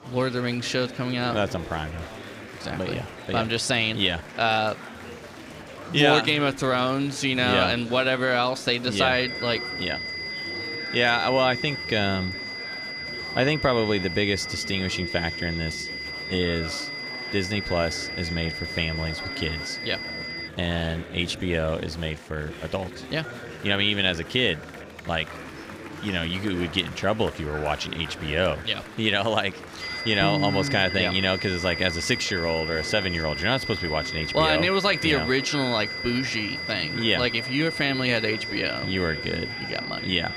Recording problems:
high-pitched whine; loud; from 9 to 20 s and from 30 s on; 2 kHz, 6 dB below the speech
murmuring crowd; noticeable; throughout; 15 dB below the speech

